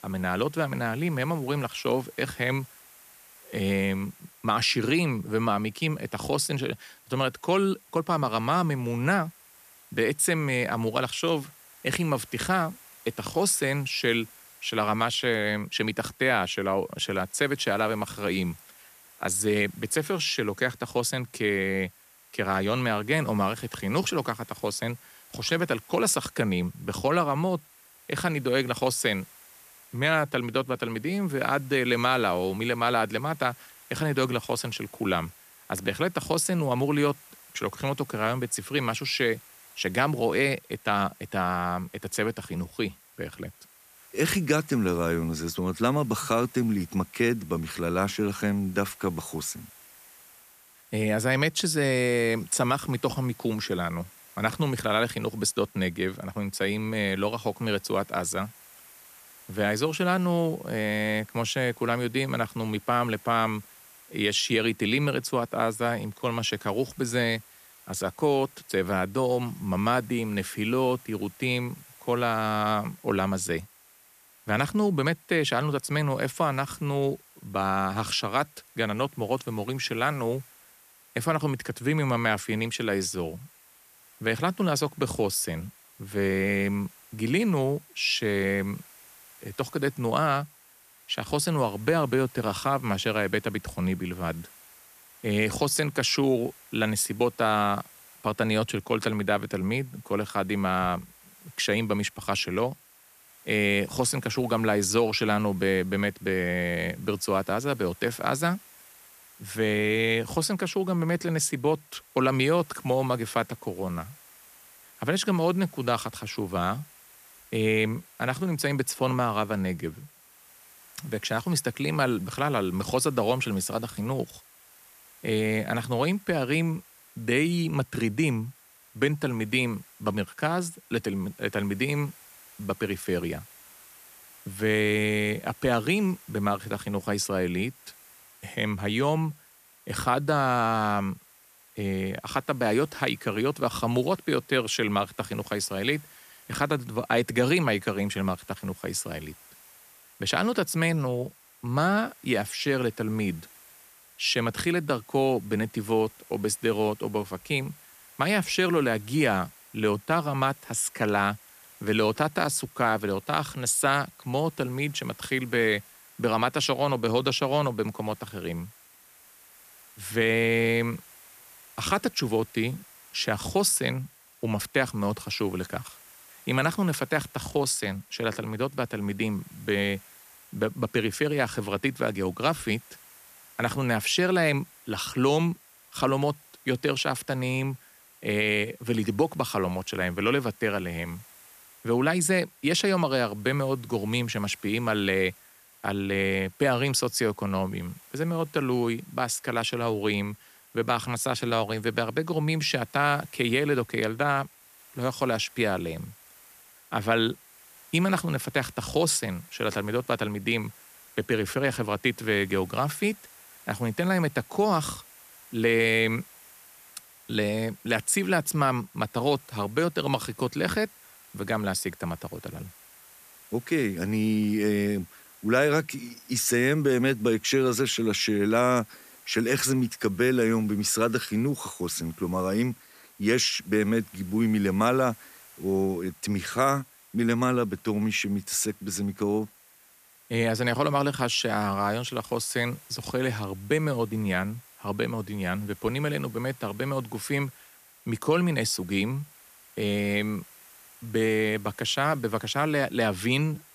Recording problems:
hiss; faint; throughout; 25 dB below the speech

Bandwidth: 14.5 kHz